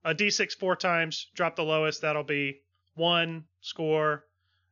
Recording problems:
high frequencies cut off; noticeable; nothing above 7 kHz

